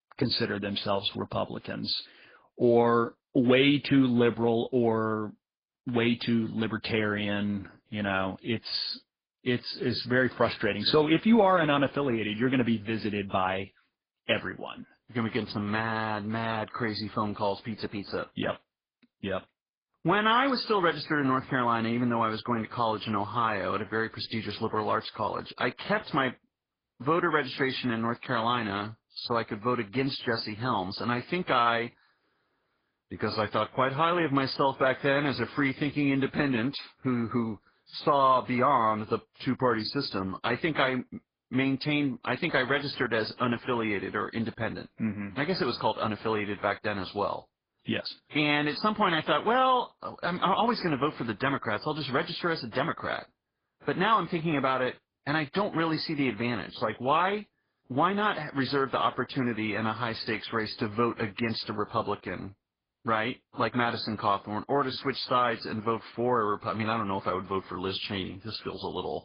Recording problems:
garbled, watery; badly; nothing above 5 kHz

